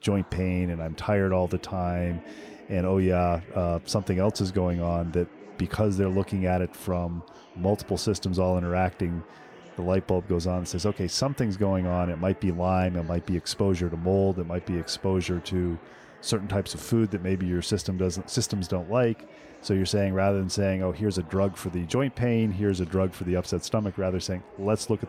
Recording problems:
chatter from many people; faint; throughout; 20 dB below the speech

